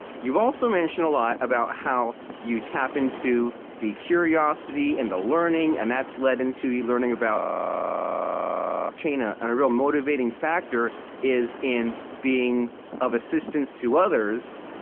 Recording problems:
phone-call audio
wind noise on the microphone; occasional gusts; 15 dB below the speech
audio freezing; at 7.5 s for 1.5 s

